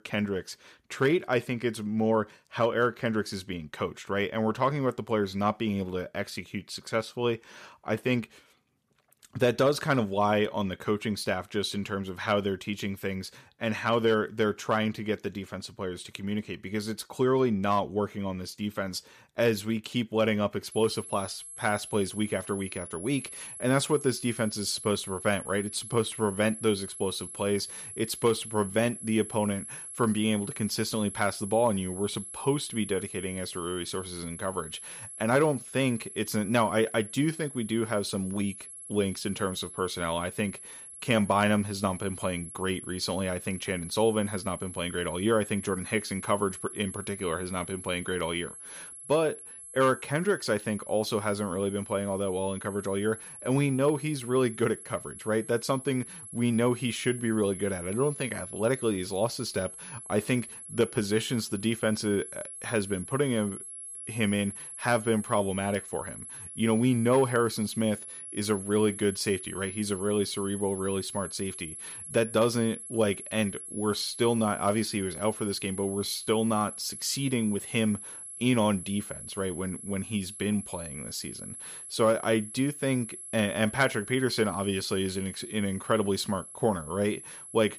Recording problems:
high-pitched whine; noticeable; from 21 s on; 11 kHz, 10 dB below the speech

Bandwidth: 14.5 kHz